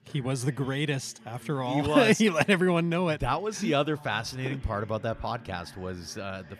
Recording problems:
voice in the background; faint; throughout; 25 dB below the speech

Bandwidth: 14.5 kHz